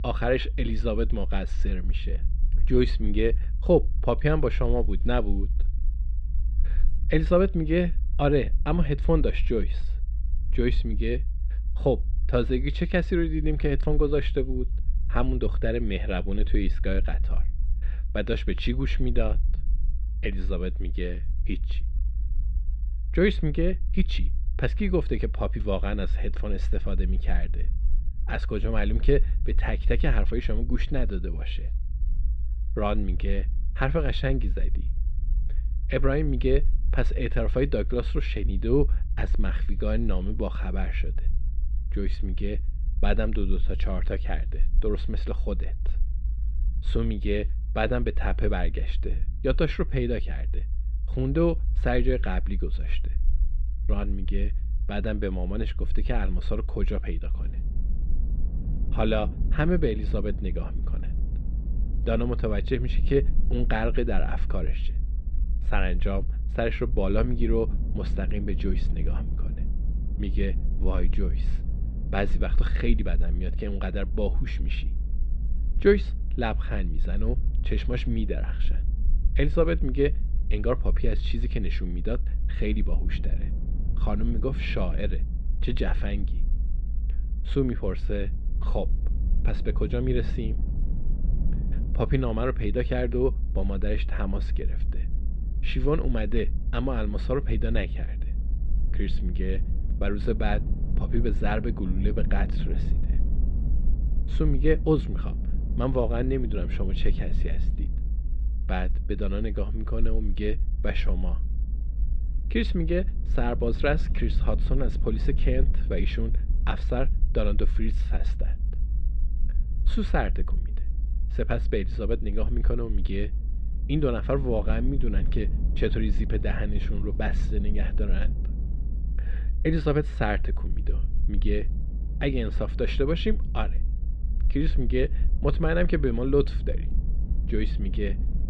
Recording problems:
muffled; slightly; fading above 3.5 kHz
wind noise on the microphone; occasional gusts; from 57 s on; 20 dB below the speech
low rumble; faint; throughout; 20 dB below the speech

